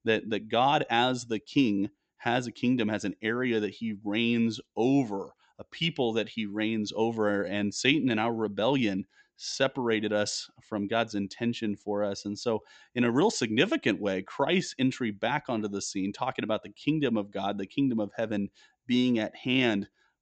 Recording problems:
high frequencies cut off; noticeable; nothing above 8 kHz

